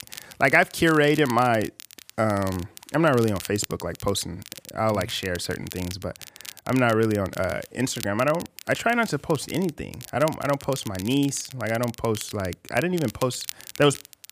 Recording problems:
crackle, like an old record; noticeable; 15 dB below the speech

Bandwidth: 15 kHz